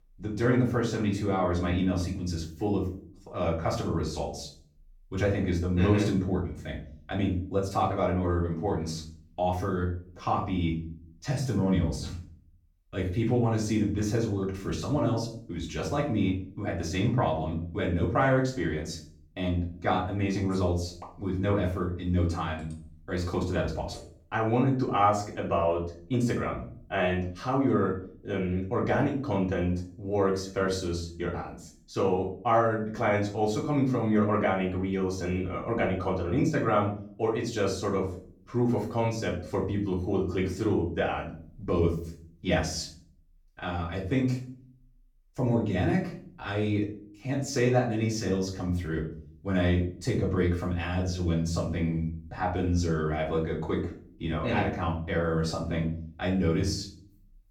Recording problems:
off-mic speech; far
room echo; slight; dies away in 0.4 s

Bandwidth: 18 kHz